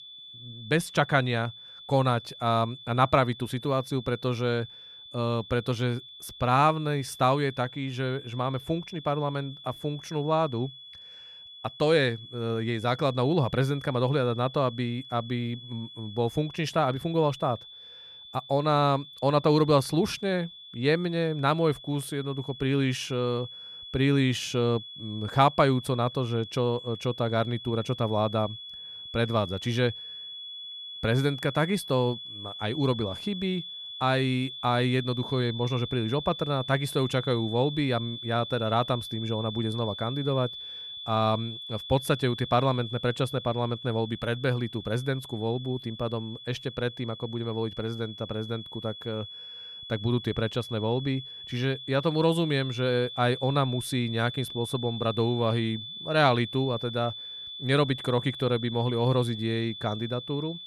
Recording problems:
high-pitched whine; noticeable; throughout; 3.5 kHz, 10 dB below the speech

